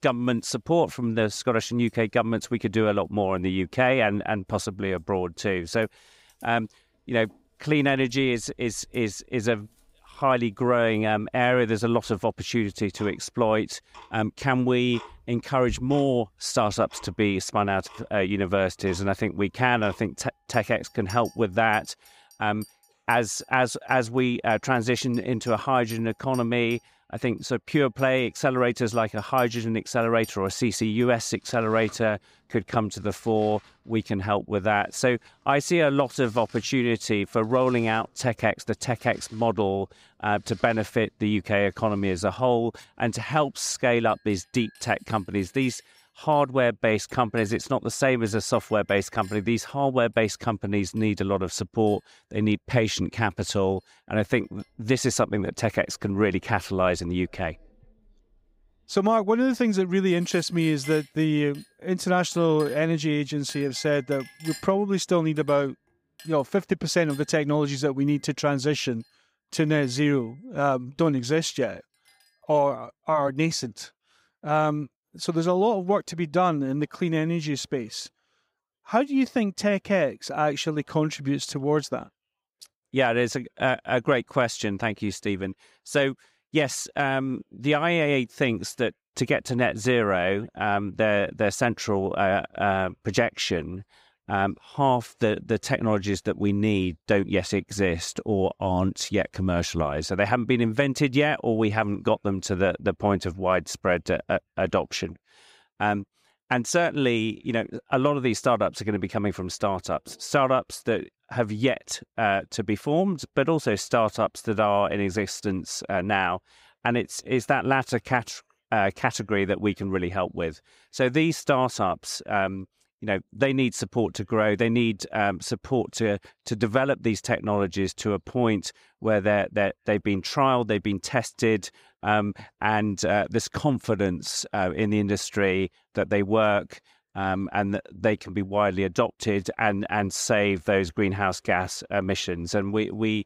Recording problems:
household noises; faint; until 1:13; 25 dB below the speech

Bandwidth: 15.5 kHz